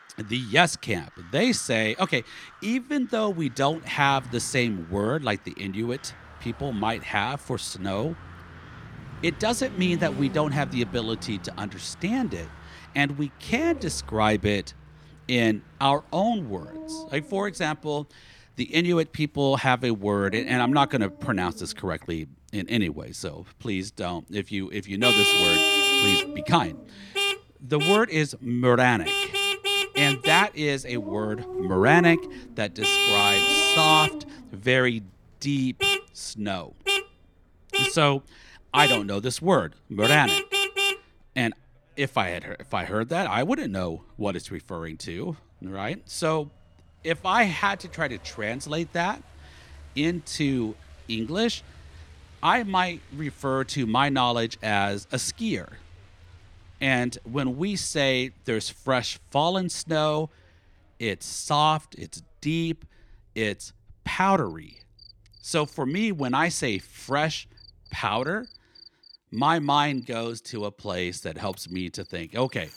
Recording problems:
traffic noise; very loud; throughout; 3 dB above the speech
animal sounds; noticeable; throughout; 15 dB below the speech

